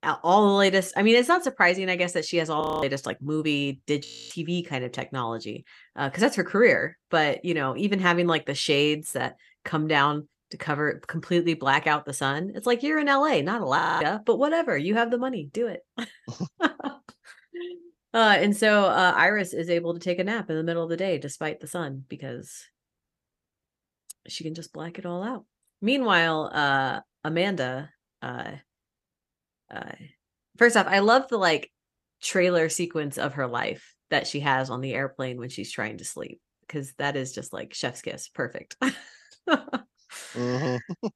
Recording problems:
audio freezing; at 2.5 s, at 4 s and at 14 s

